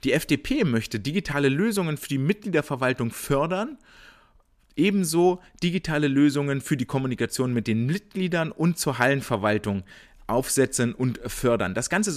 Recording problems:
abrupt cut into speech; at the end

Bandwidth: 14.5 kHz